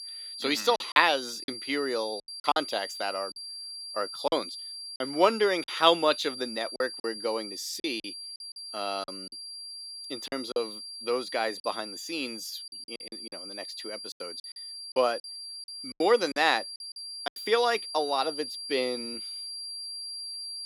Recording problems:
thin; very slightly; fading below 300 Hz
high-pitched whine; loud; throughout; 4.5 kHz, 9 dB below the speech
choppy; very; 8% of the speech affected

